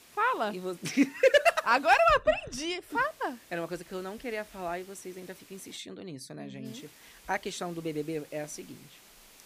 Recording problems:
hiss; faint; until 2 s, from 3 to 6 s and from 6.5 s on; 25 dB below the speech

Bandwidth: 15 kHz